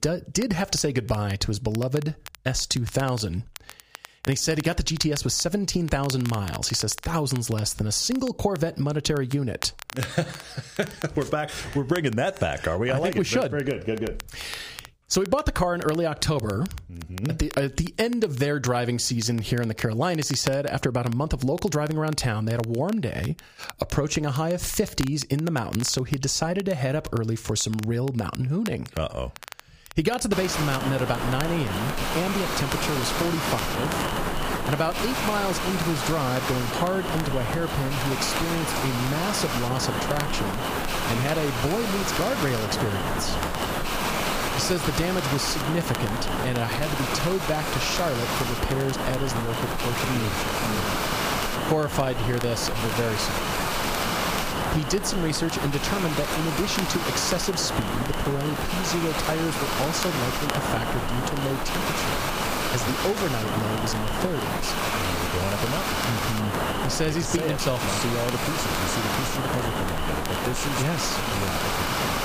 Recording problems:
squashed, flat; somewhat
hiss; loud; from 30 s on; 1 dB below the speech
crackle, like an old record; noticeable; 15 dB below the speech

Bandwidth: 15 kHz